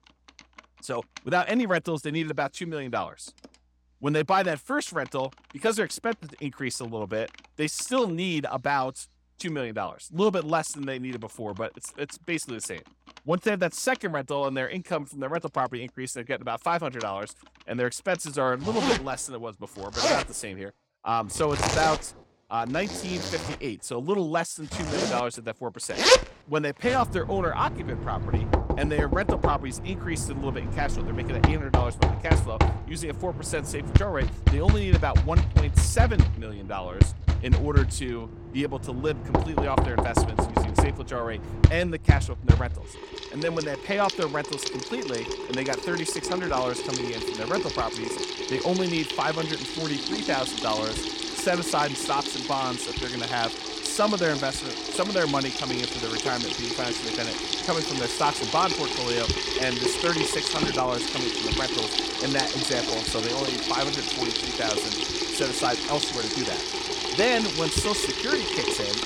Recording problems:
household noises; very loud; throughout; 2 dB above the speech

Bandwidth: 17 kHz